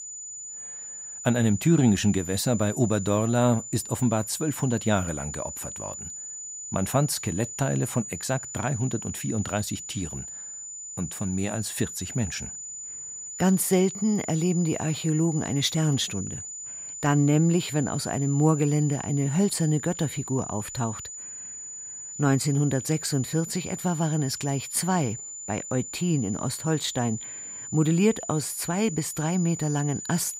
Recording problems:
high-pitched whine; loud; throughout; 7 kHz, 9 dB below the speech

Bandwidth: 15.5 kHz